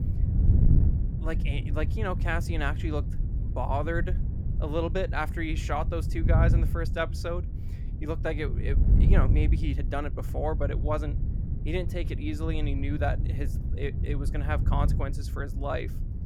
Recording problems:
wind noise on the microphone; heavy; 10 dB below the speech

